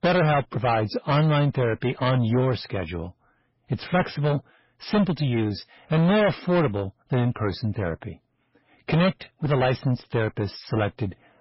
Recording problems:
distortion; heavy; 6 dB below the speech
garbled, watery; badly; nothing above 5.5 kHz

